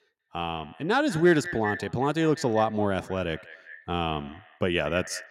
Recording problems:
echo of what is said; noticeable; throughout; 190 ms later, 15 dB below the speech

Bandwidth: 16 kHz